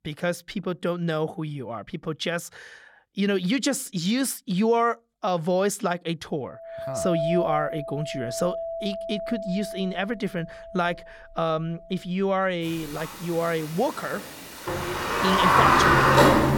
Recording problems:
household noises; very loud; from 7 s on; 4 dB above the speech

